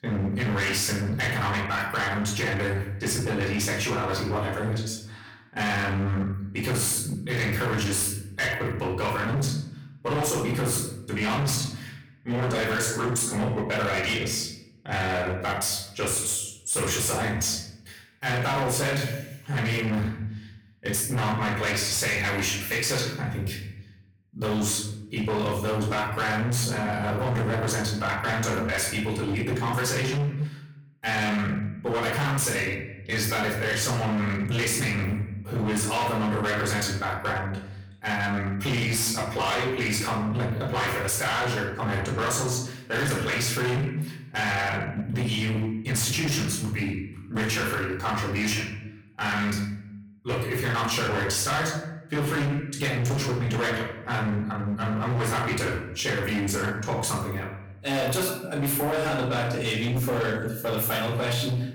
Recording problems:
distortion; heavy; 23% of the sound clipped
off-mic speech; far
room echo; noticeable; dies away in 0.7 s

